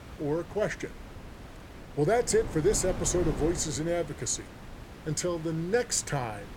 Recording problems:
wind noise on the microphone; occasional gusts; 15 dB below the speech
hiss; faint; throughout; 25 dB below the speech

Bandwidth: 17.5 kHz